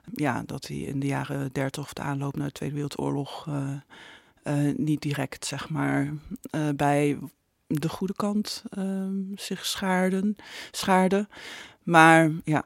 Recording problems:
none

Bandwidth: 16 kHz